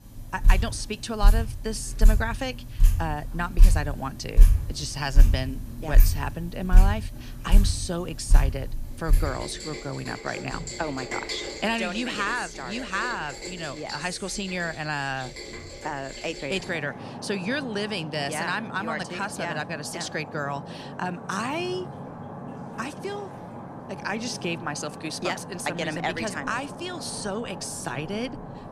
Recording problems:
rain or running water; very loud; throughout; 1 dB above the speech

